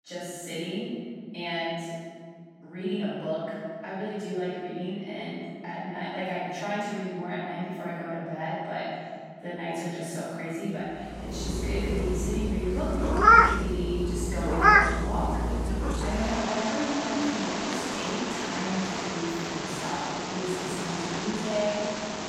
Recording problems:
room echo; strong; dies away in 2.8 s
off-mic speech; far
animal sounds; very loud; from 11 s on; 6 dB above the speech

